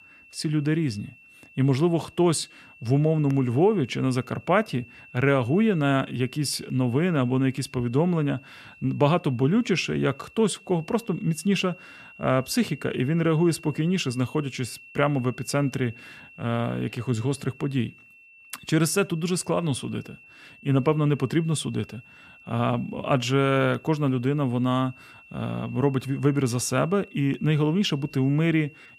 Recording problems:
high-pitched whine; faint; throughout; 2.5 kHz, 25 dB below the speech

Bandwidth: 14.5 kHz